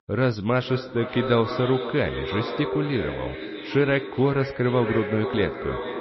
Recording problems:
echo of what is said; strong; throughout; 470 ms later, 7 dB below the speech
garbled, watery; slightly; nothing above 5.5 kHz

